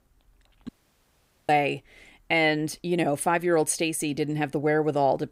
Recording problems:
audio cutting out; at 0.5 s for 1 s

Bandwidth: 15.5 kHz